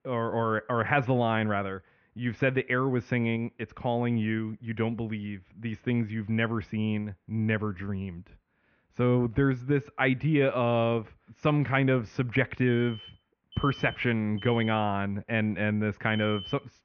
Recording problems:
muffled; very slightly; fading above 2.5 kHz
high frequencies cut off; slight; nothing above 6.5 kHz
alarms or sirens; noticeable; throughout; 15 dB below the speech

